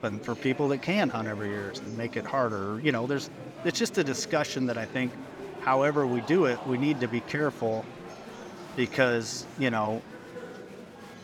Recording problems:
murmuring crowd; noticeable; throughout; 15 dB below the speech

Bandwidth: 17.5 kHz